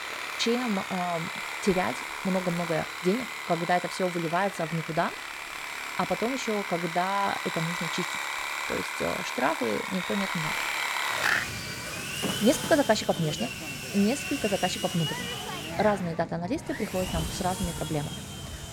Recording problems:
machinery noise; loud; throughout; 3 dB below the speech

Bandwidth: 17.5 kHz